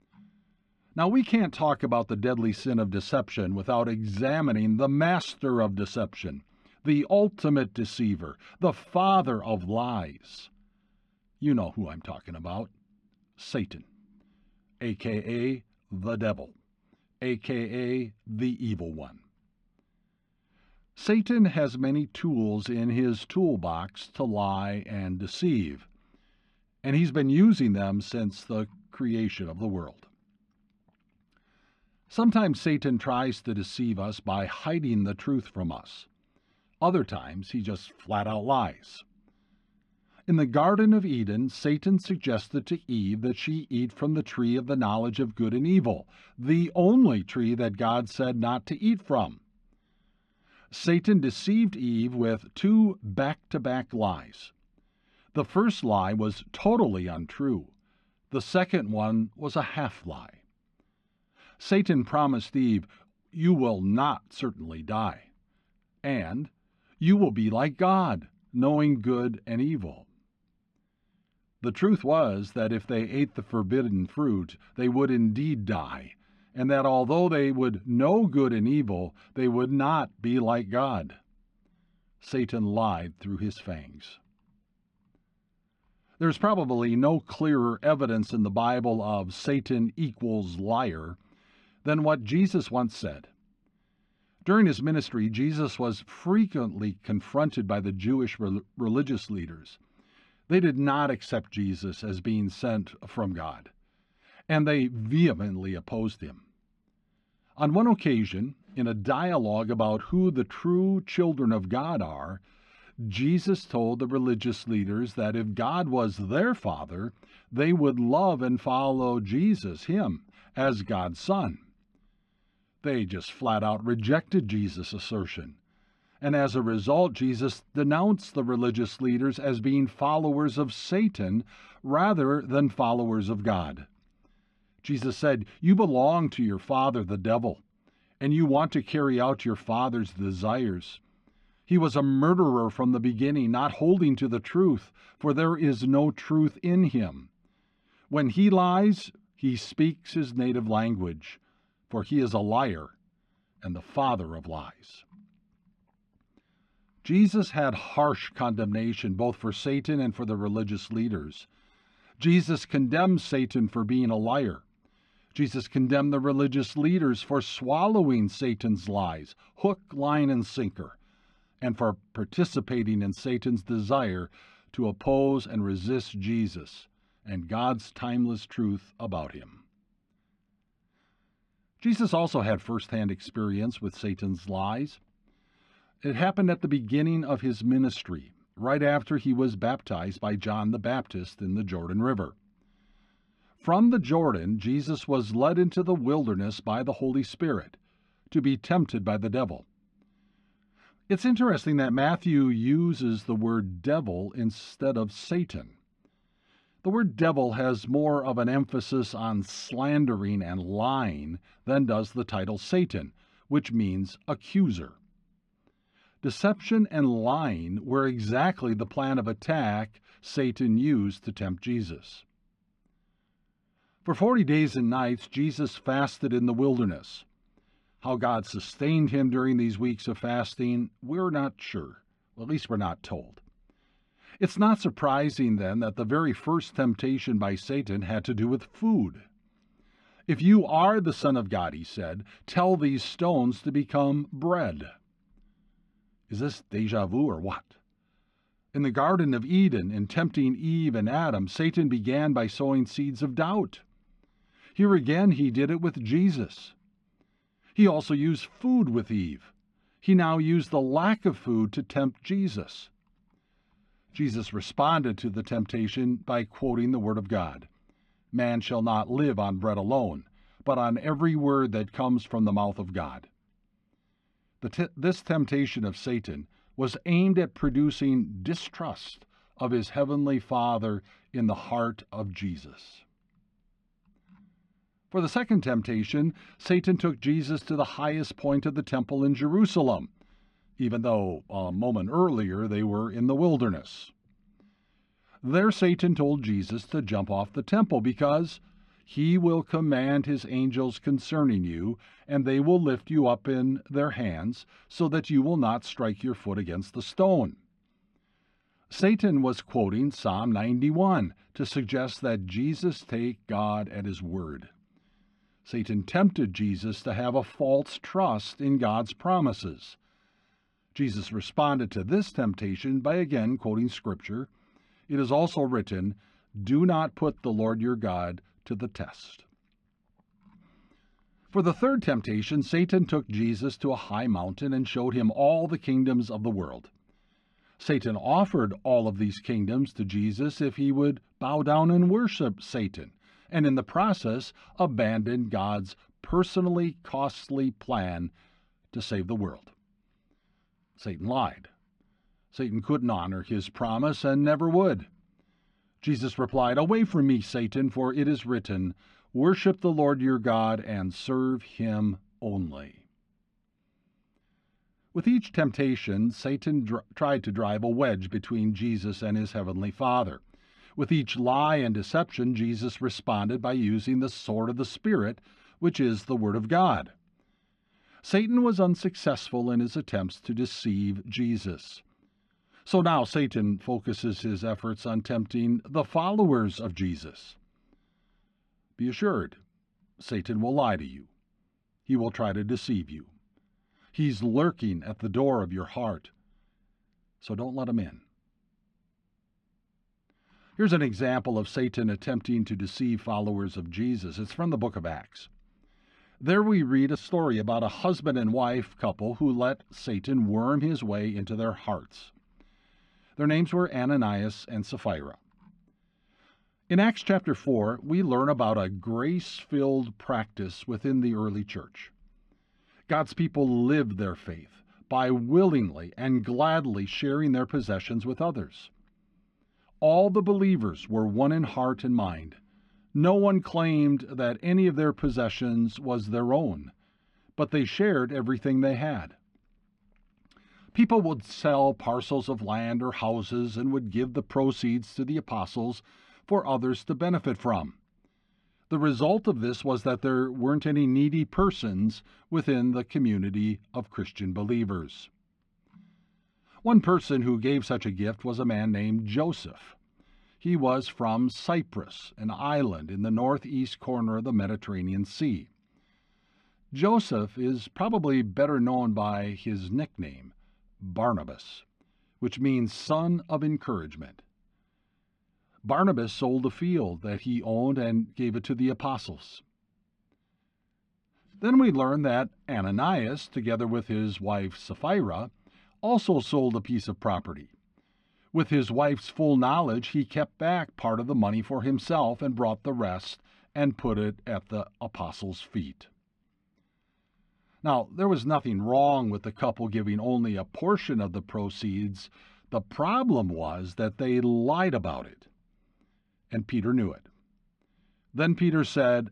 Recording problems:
muffled; slightly; fading above 3.5 kHz

